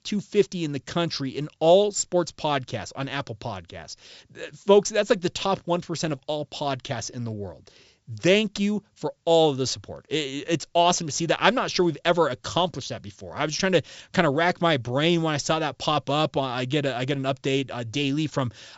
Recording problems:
high frequencies cut off; noticeable; nothing above 8 kHz

